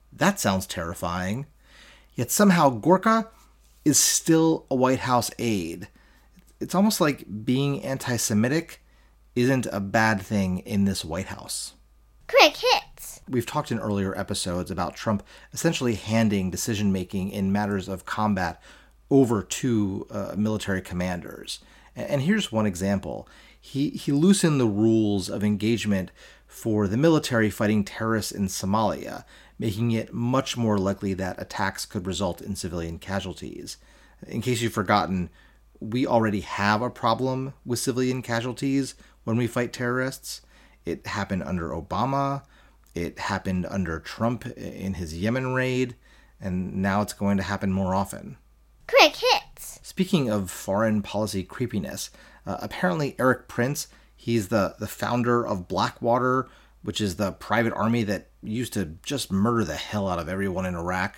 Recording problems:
none

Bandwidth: 16.5 kHz